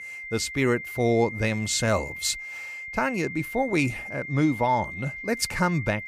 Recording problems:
high-pitched whine; loud; throughout; 2 kHz, 9 dB below the speech

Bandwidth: 15 kHz